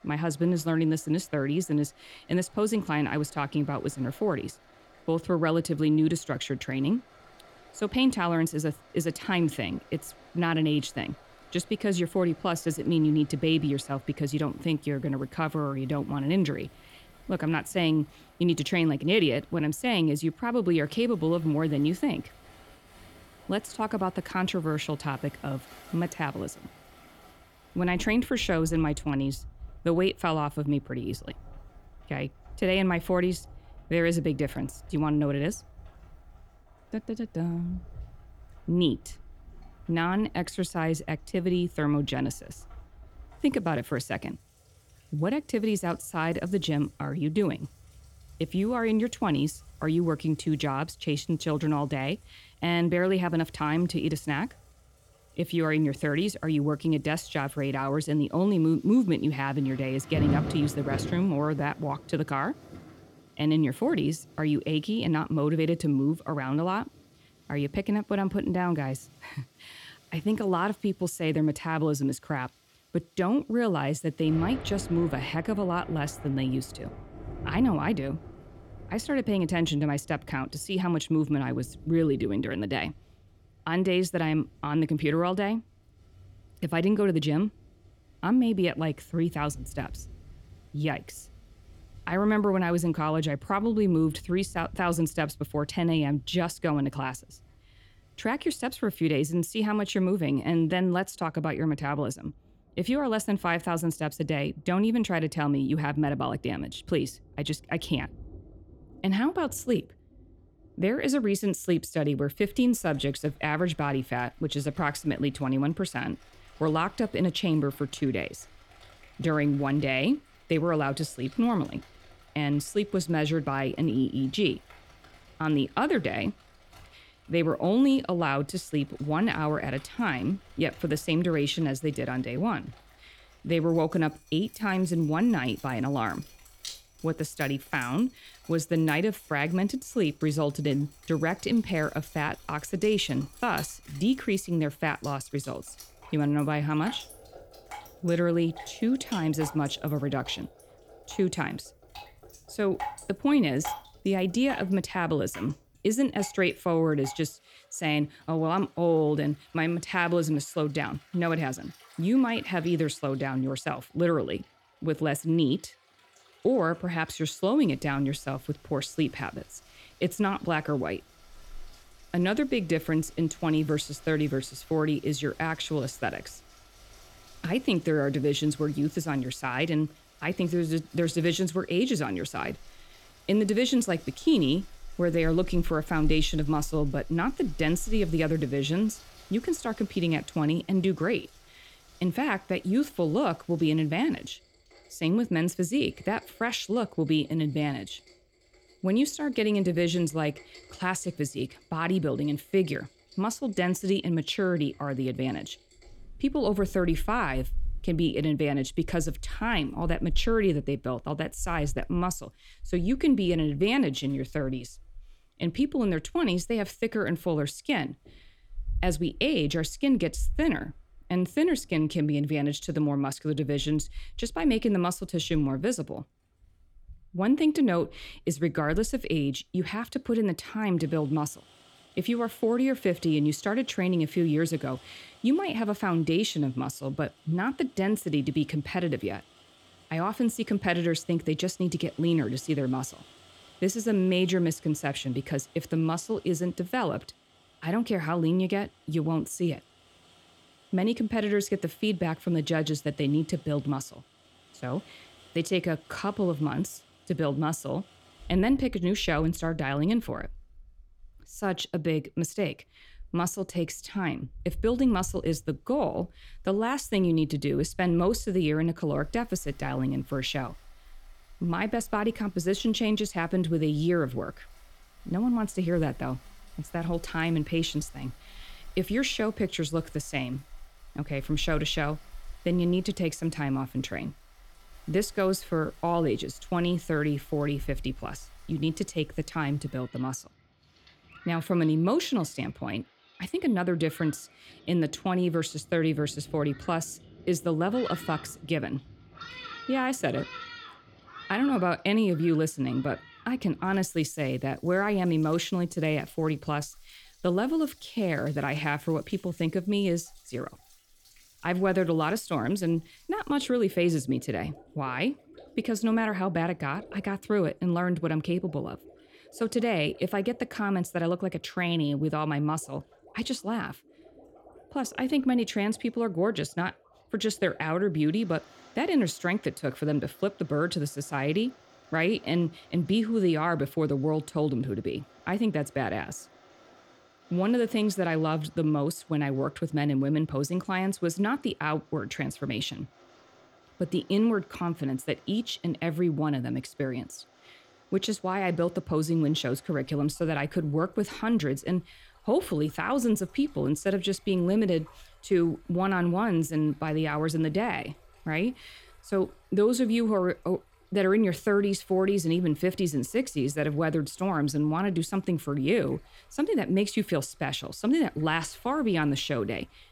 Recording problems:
rain or running water; faint; throughout; 20 dB below the speech

